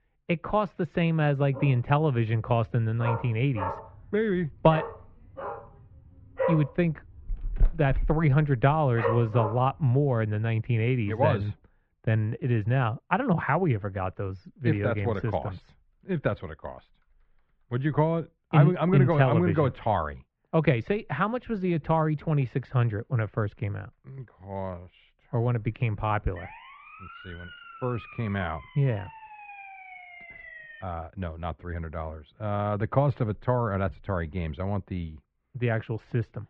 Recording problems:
muffled; very; fading above 2.5 kHz
dog barking; noticeable; from 1.5 to 9.5 s; peak 2 dB below the speech
siren; faint; from 26 to 31 s; peak 15 dB below the speech

